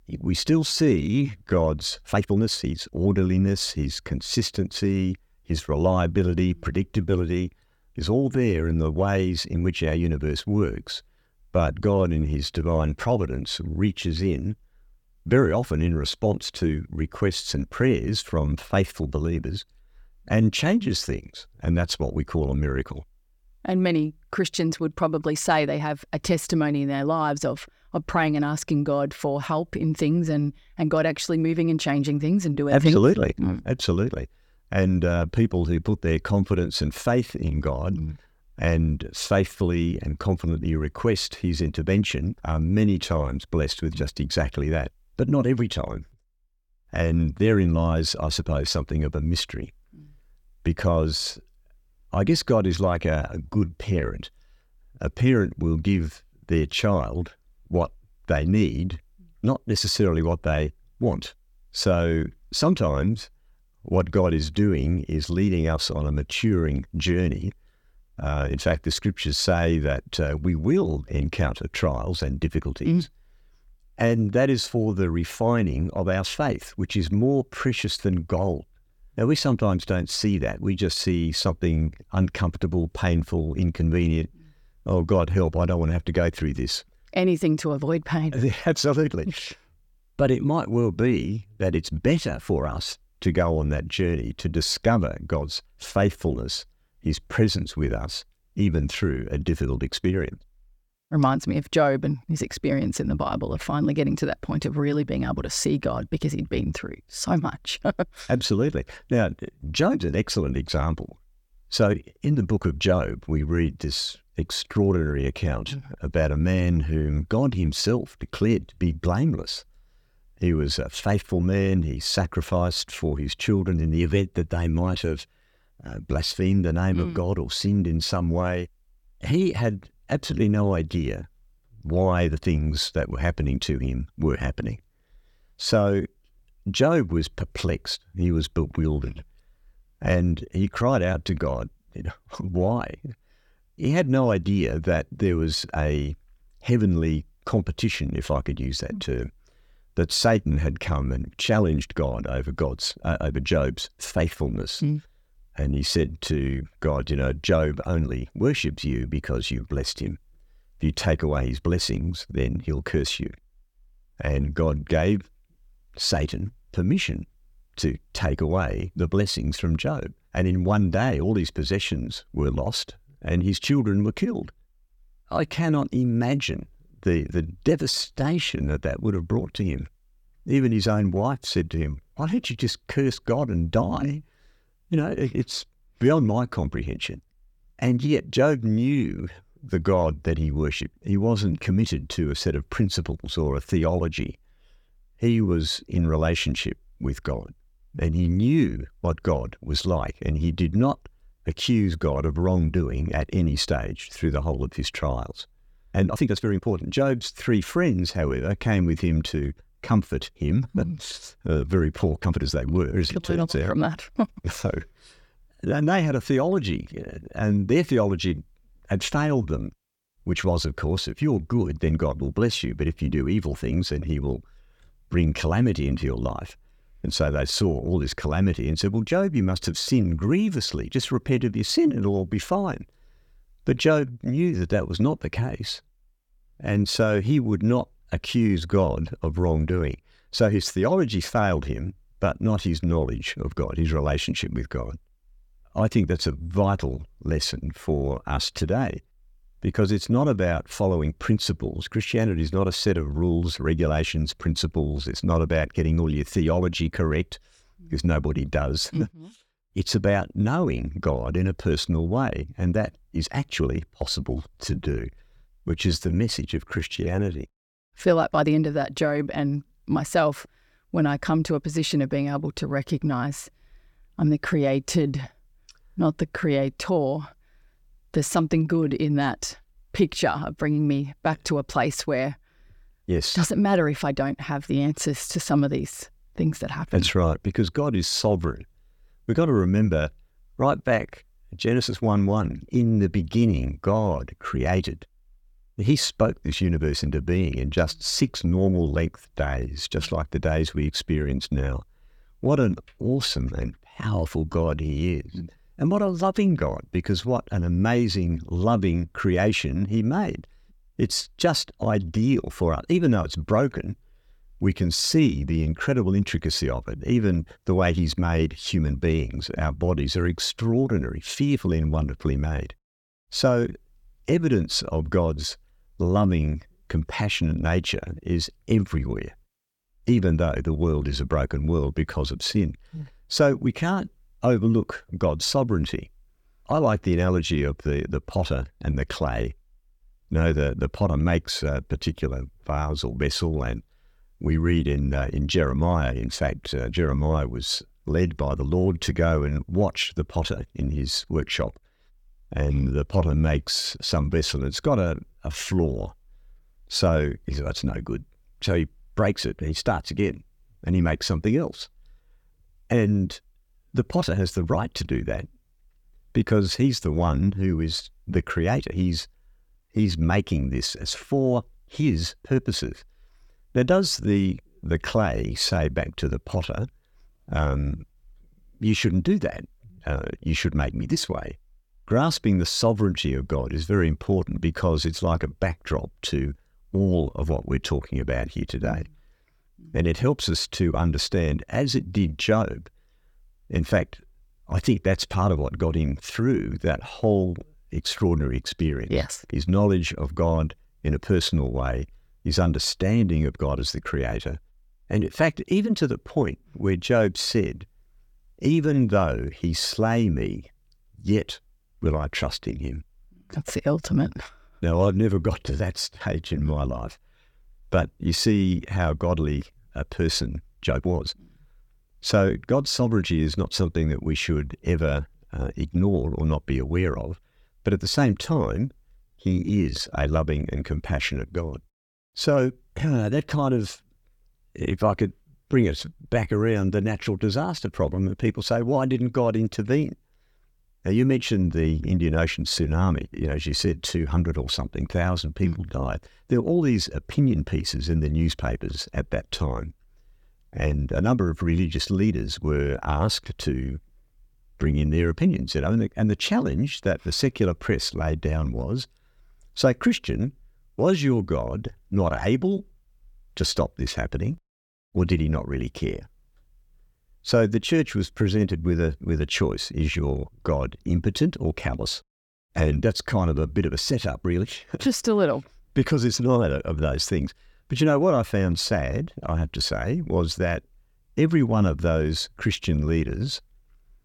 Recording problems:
uneven, jittery; strongly; from 1 s to 7:17

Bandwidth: 18.5 kHz